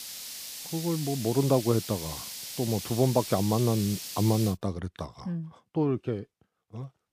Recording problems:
hiss; loud; until 4.5 s; 8 dB below the speech

